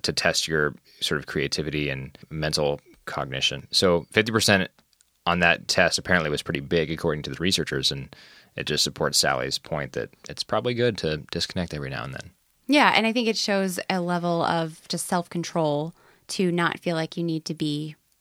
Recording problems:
none

